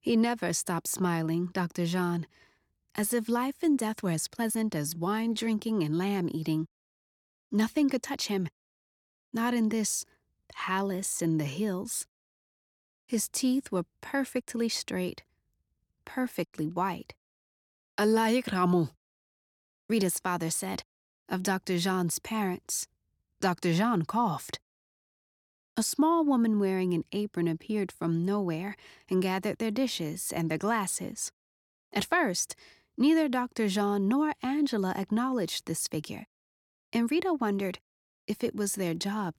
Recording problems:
uneven, jittery; strongly; from 3.5 to 12 s

